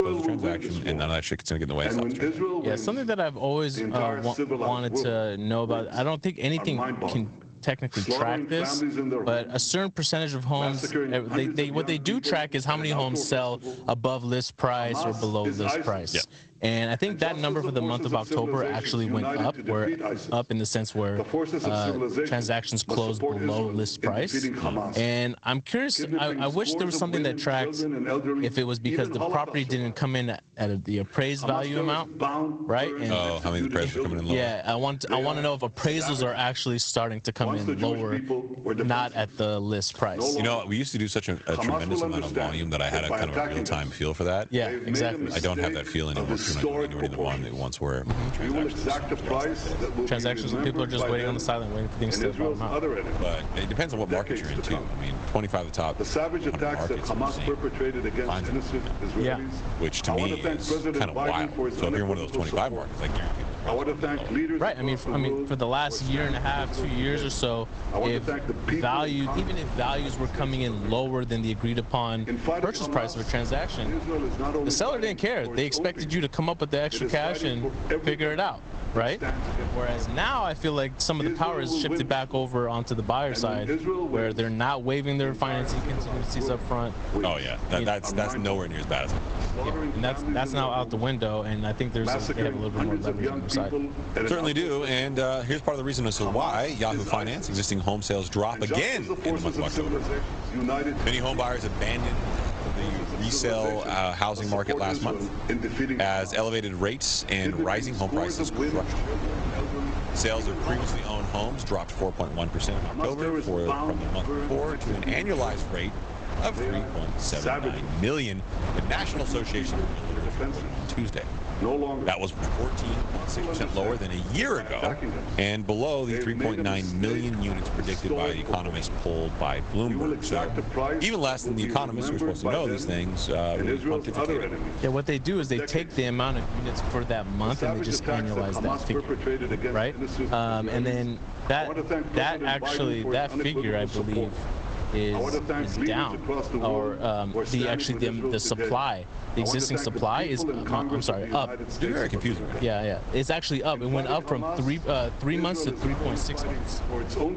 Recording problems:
garbled, watery; slightly; nothing above 8 kHz
squashed, flat; somewhat
voice in the background; loud; throughout; 3 dB below the speech
wind noise on the microphone; occasional gusts; from 48 s on; 10 dB below the speech

